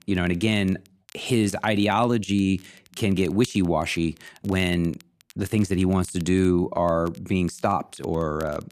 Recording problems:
crackle, like an old record; faint; 30 dB below the speech

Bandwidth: 14.5 kHz